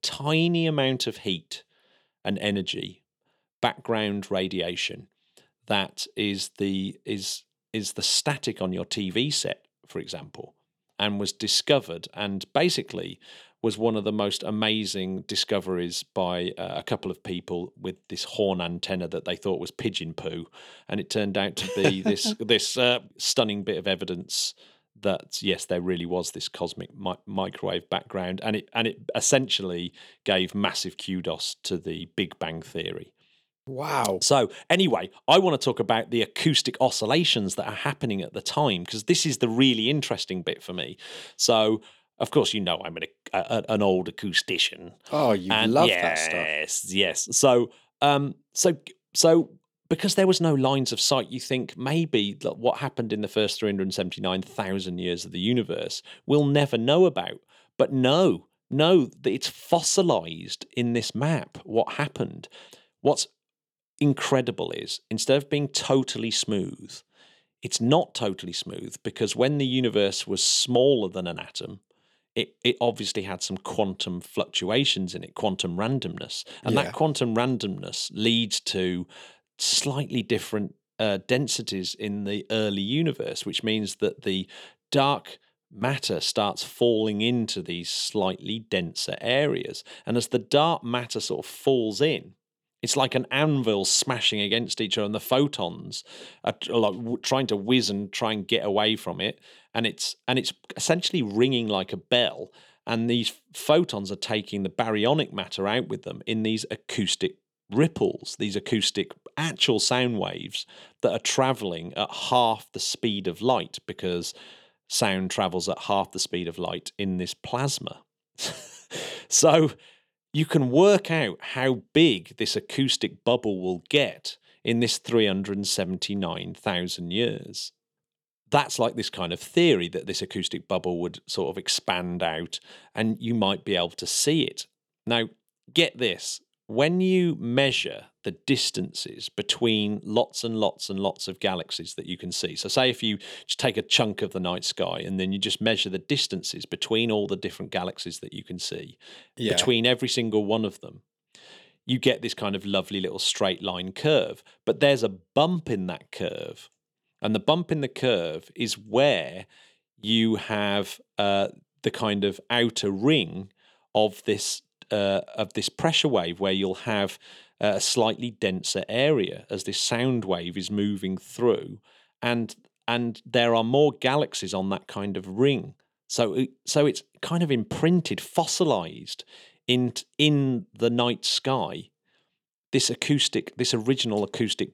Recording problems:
none

